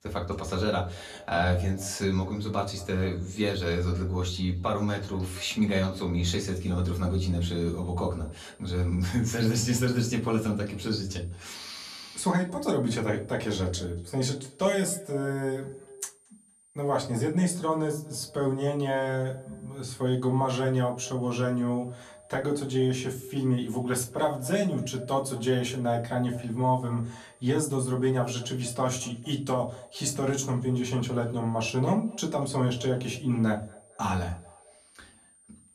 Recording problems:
off-mic speech; far
echo of what is said; faint; throughout; 230 ms later, 20 dB below the speech
room echo; very slight; dies away in 0.3 s
high-pitched whine; faint; from 6.5 s on; 9 kHz, 30 dB below the speech

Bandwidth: 14 kHz